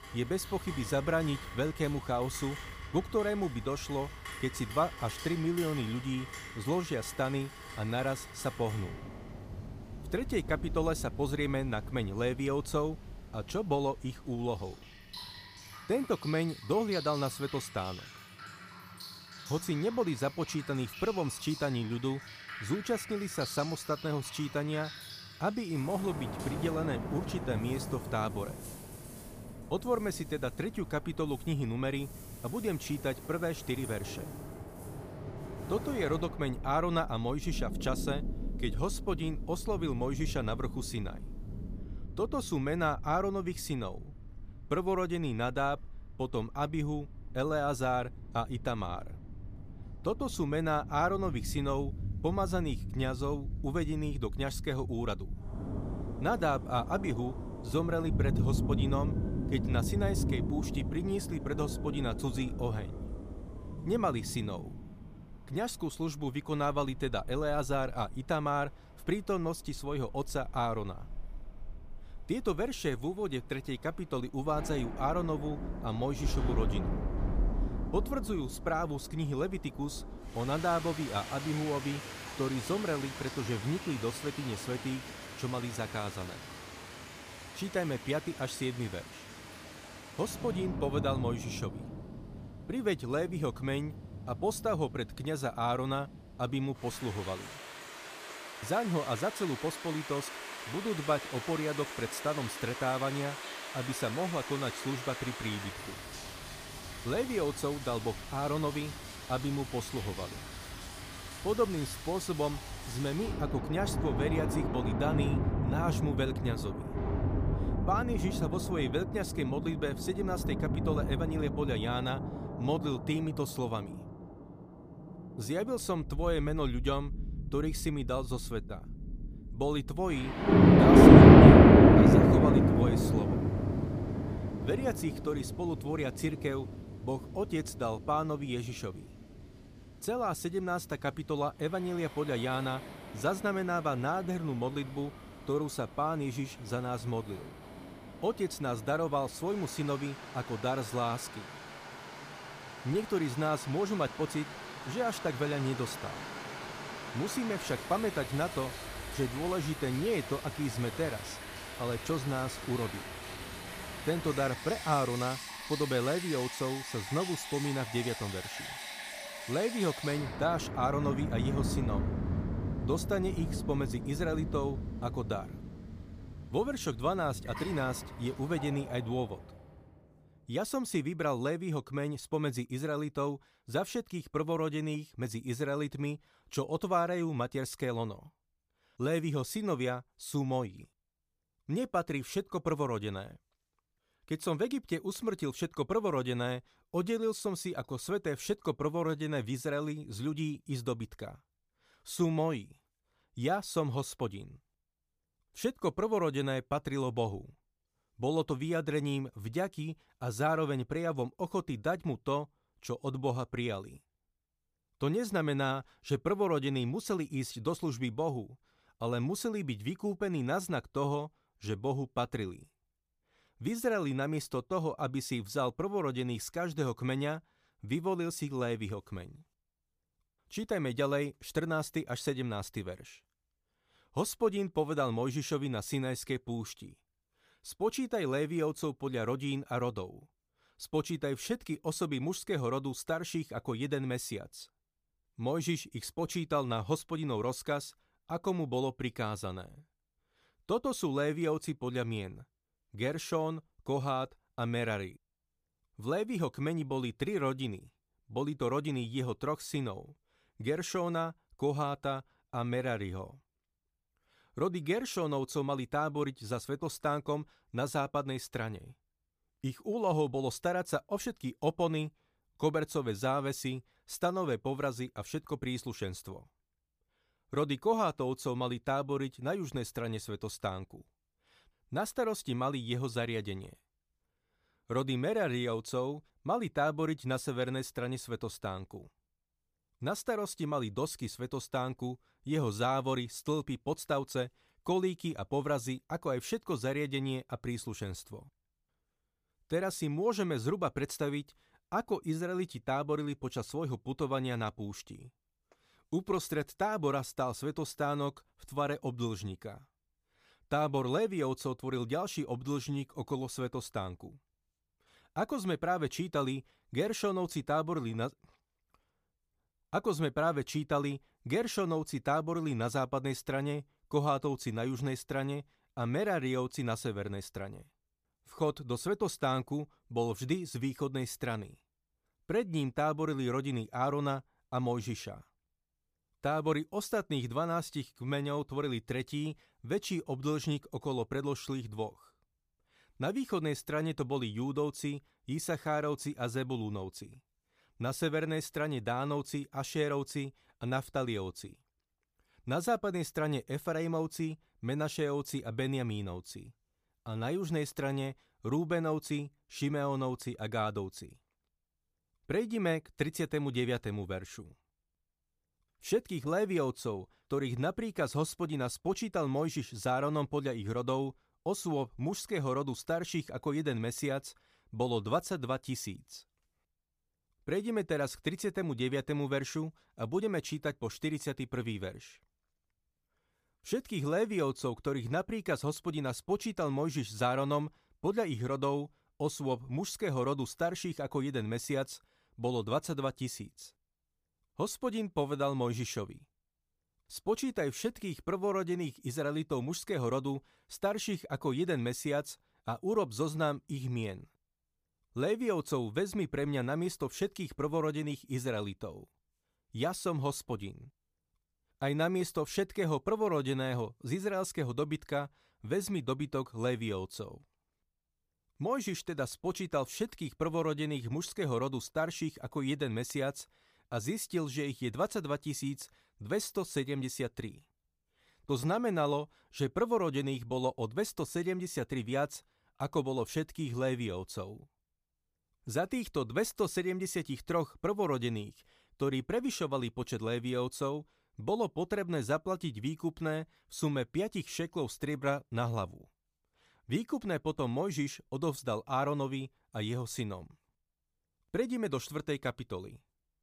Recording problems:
rain or running water; very loud; until 2:59; 4 dB above the speech

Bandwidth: 15 kHz